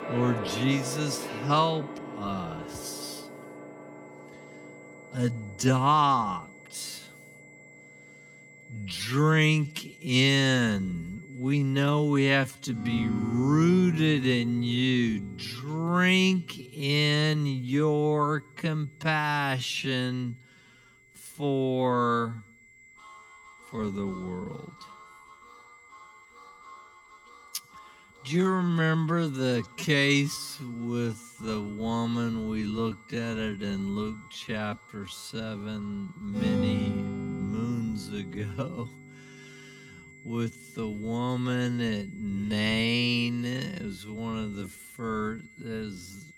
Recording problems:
wrong speed, natural pitch; too slow; 0.5 times normal speed
background music; noticeable; throughout; 10 dB below the speech
high-pitched whine; faint; throughout; 2 kHz, 25 dB below the speech

